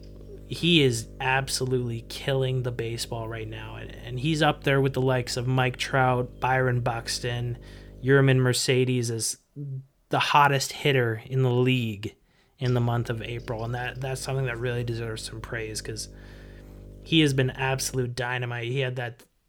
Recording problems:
electrical hum; faint; until 8.5 s and from 13 to 18 s; 50 Hz, 25 dB below the speech

